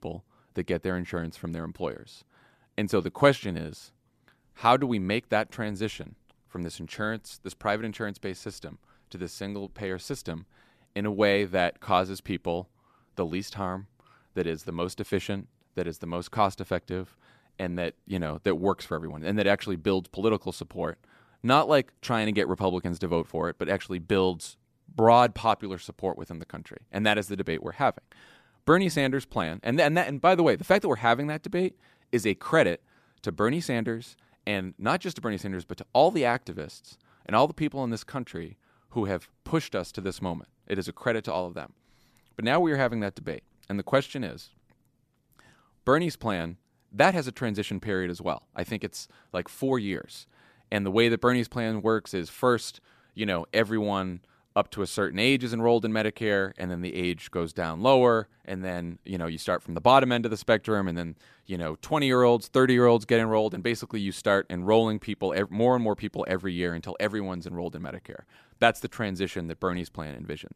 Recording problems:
none

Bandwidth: 14.5 kHz